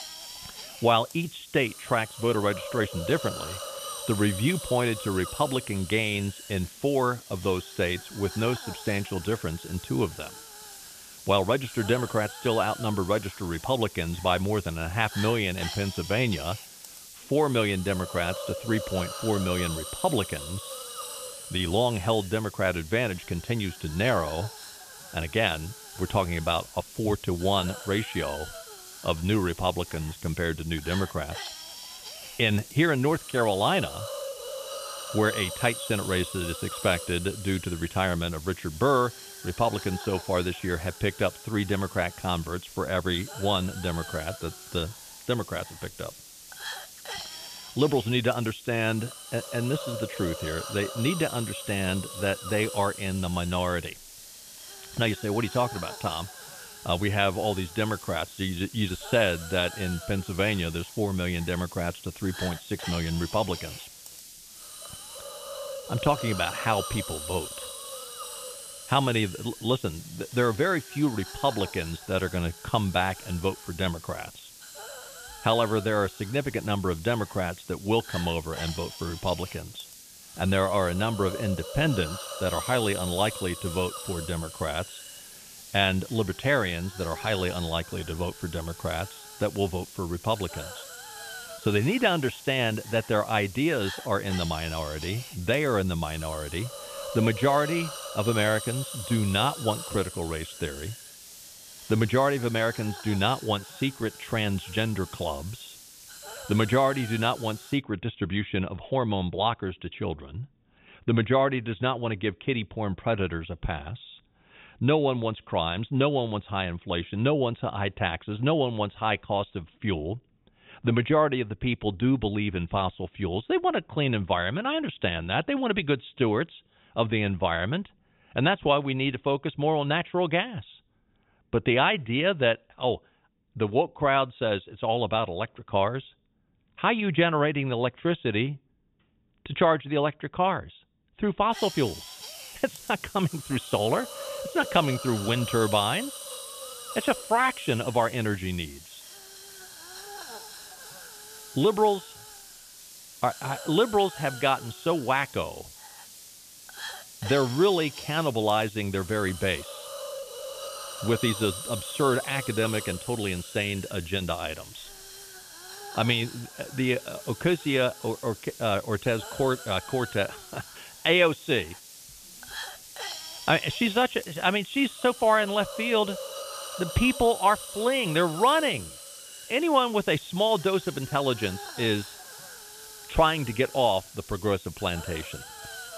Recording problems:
high frequencies cut off; severe; nothing above 3.5 kHz
hiss; noticeable; until 1:48 and from 2:22 on; 10 dB below the speech

